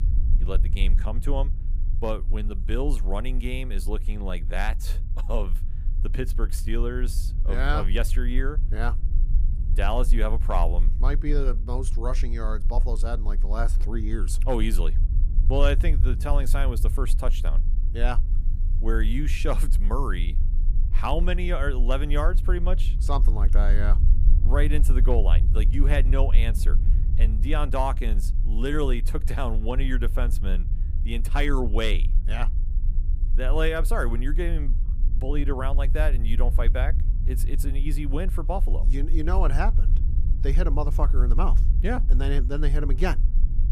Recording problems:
low rumble; noticeable; throughout; 15 dB below the speech

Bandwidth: 15 kHz